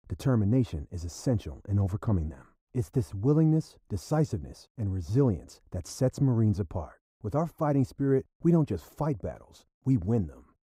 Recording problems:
muffled; very; fading above 1.5 kHz

